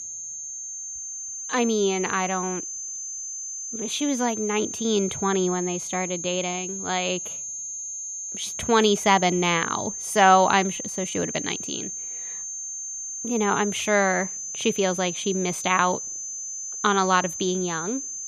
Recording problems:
high-pitched whine; loud; throughout; 6.5 kHz, 6 dB below the speech

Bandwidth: 15 kHz